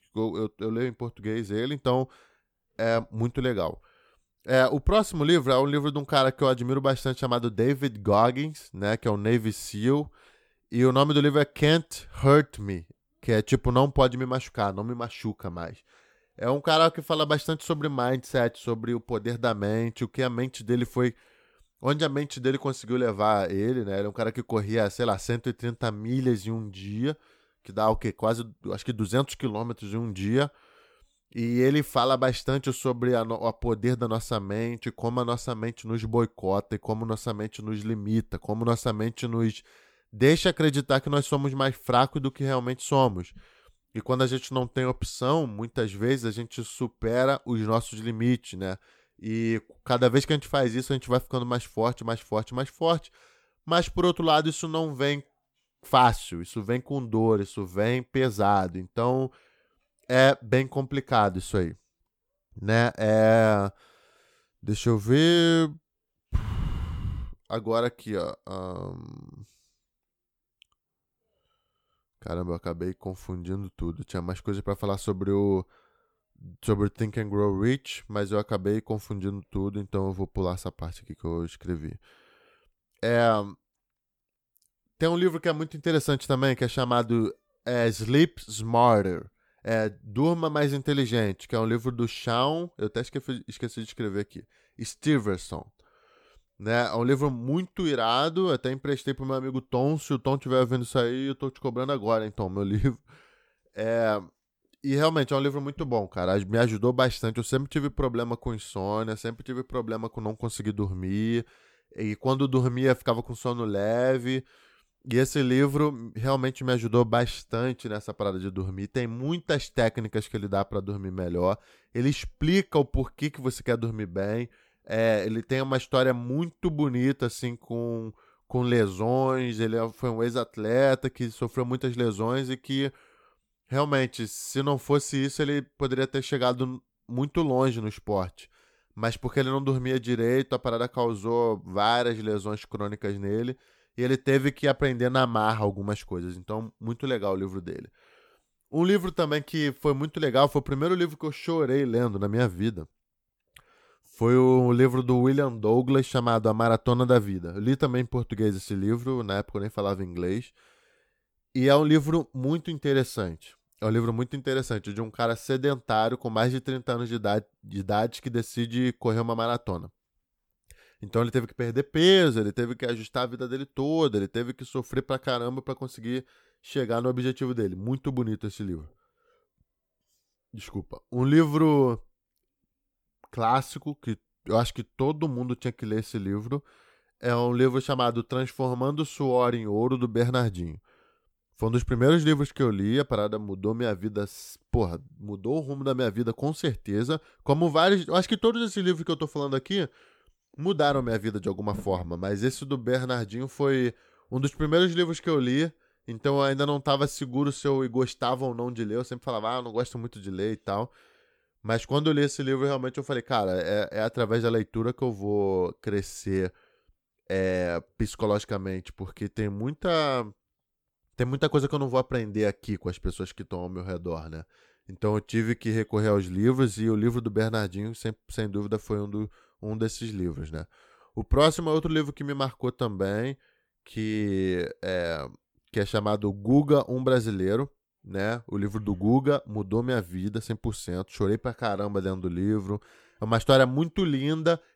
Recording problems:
none

